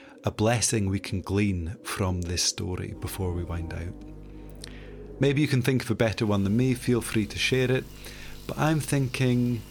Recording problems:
electrical hum; faint; from 3 to 5.5 s and from 6.5 s on; 50 Hz, 25 dB below the speech
animal sounds; faint; throughout; 25 dB below the speech

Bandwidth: 18.5 kHz